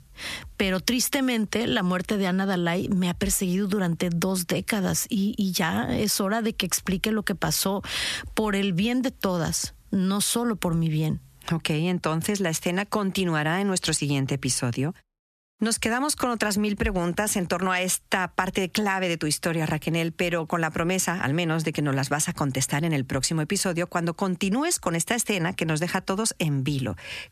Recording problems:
squashed, flat; somewhat

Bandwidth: 14 kHz